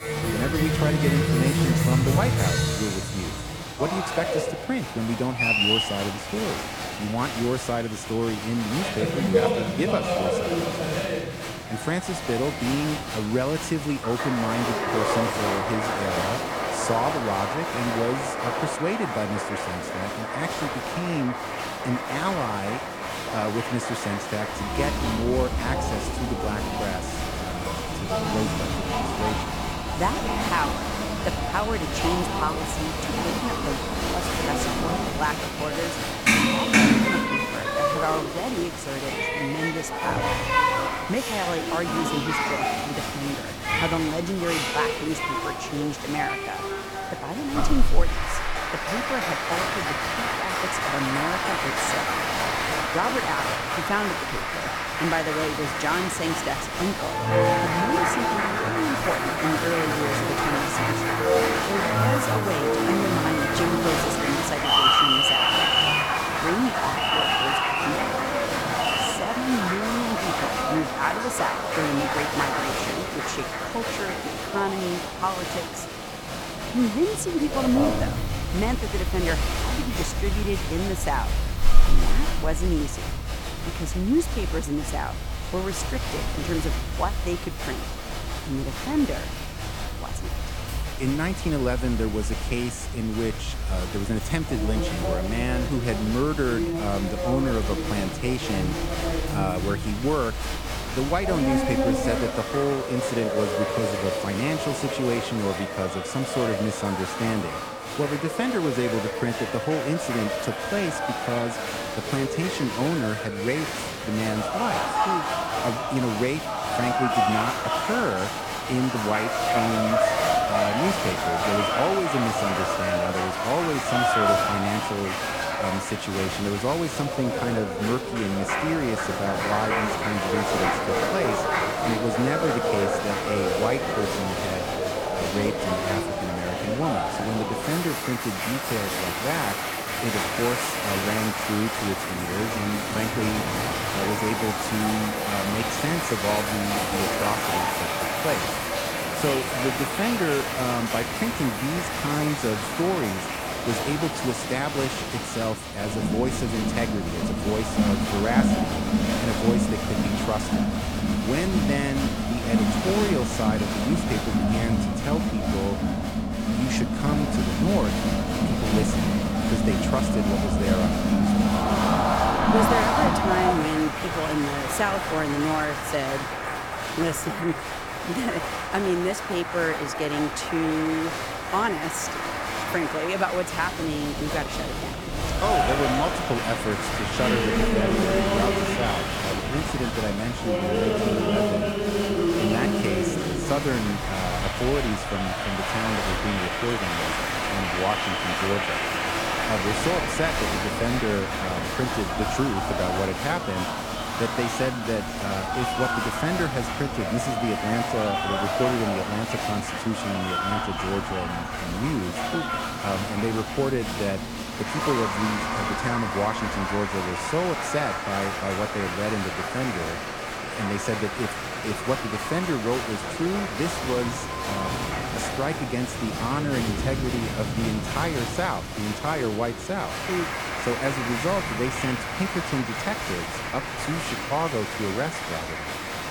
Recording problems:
crowd noise; very loud; throughout; 2 dB above the speech
rain or running water; noticeable; throughout; 10 dB below the speech

